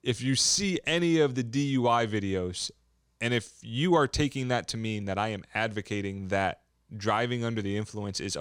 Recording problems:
abrupt cut into speech; at the end

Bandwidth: 17.5 kHz